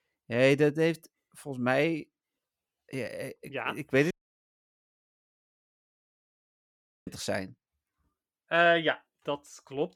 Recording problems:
audio cutting out; at 4 s for 3 s

